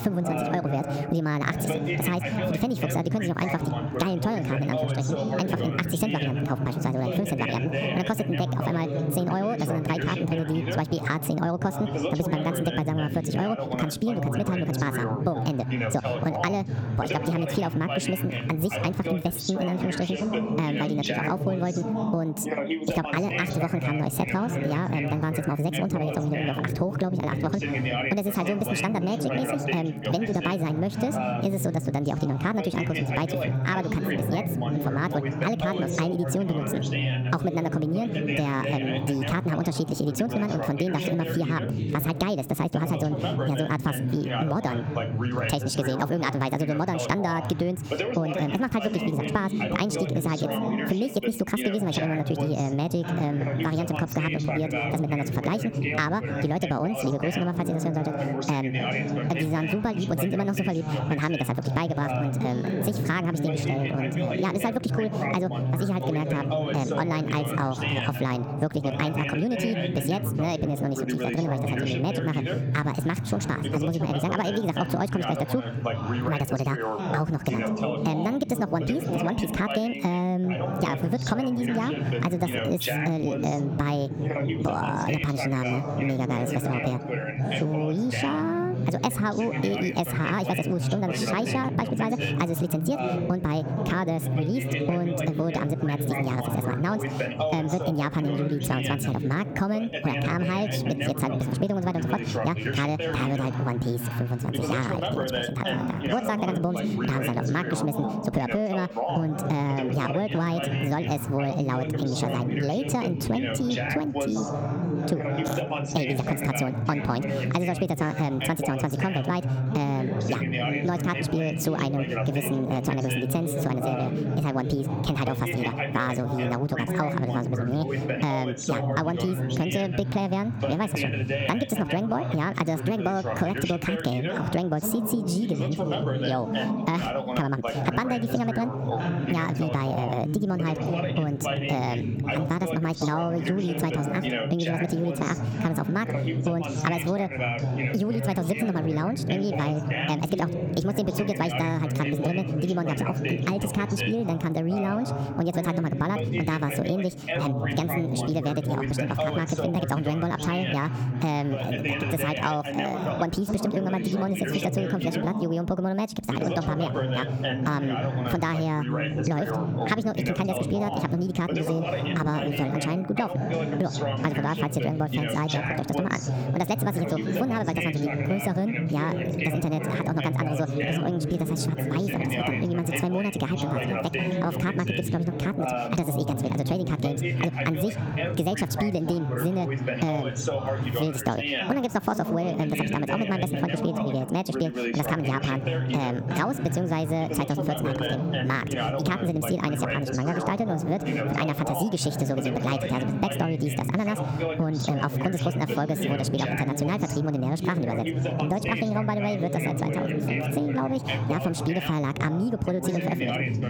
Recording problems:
wrong speed and pitch; too fast and too high; 1.5 times normal speed
squashed, flat; somewhat
background chatter; loud; throughout; 2 voices, 2 dB below the speech

